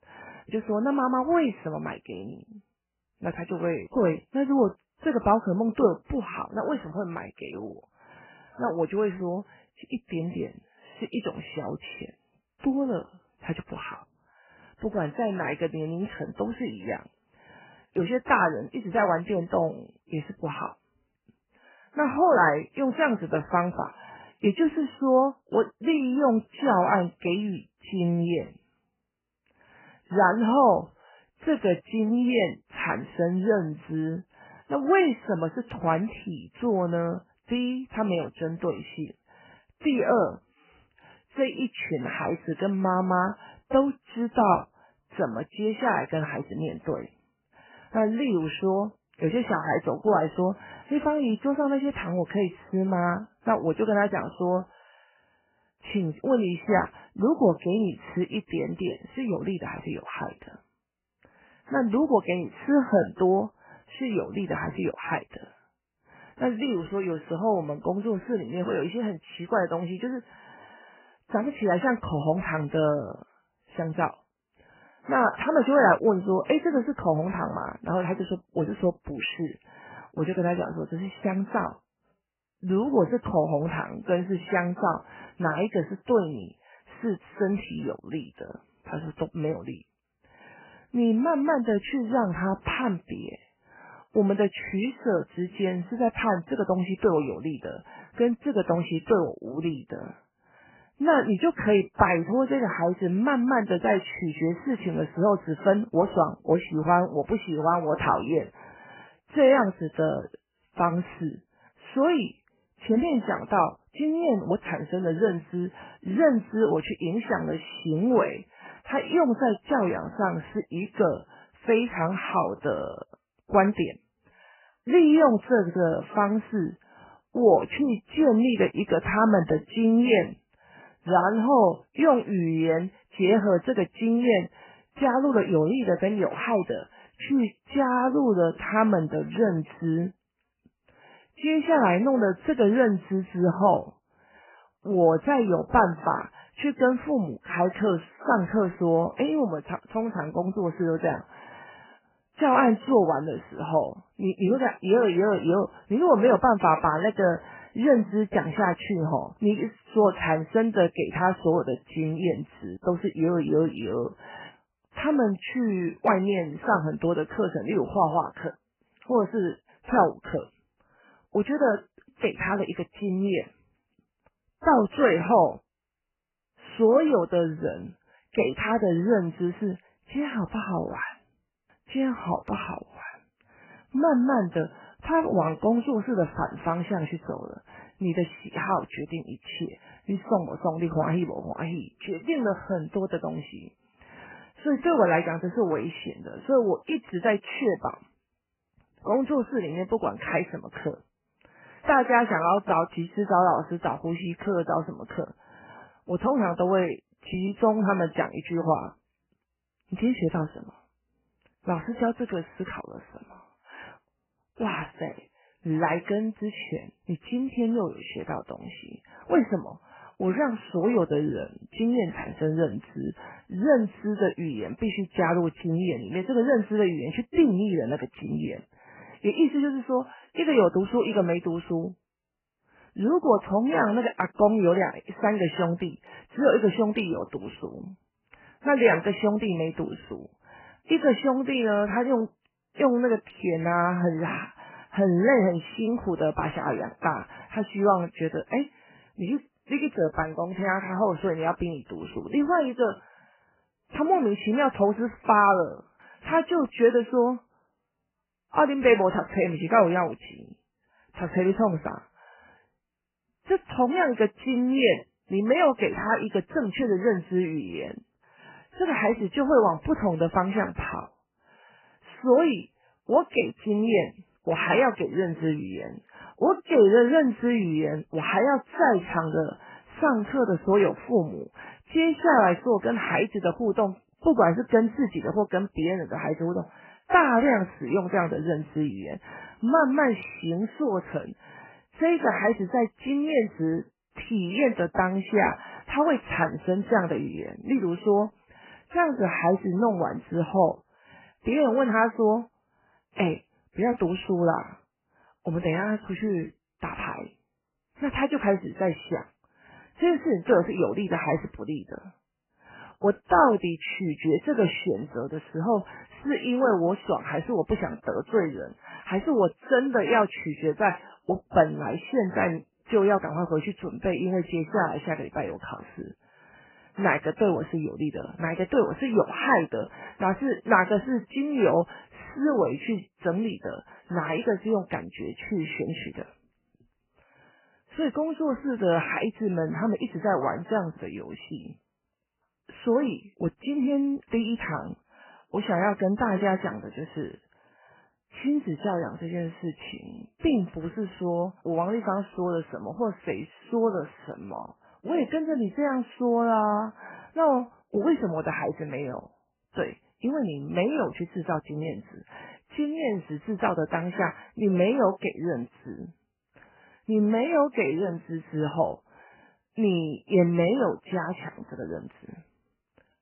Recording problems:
garbled, watery; badly; nothing above 3 kHz

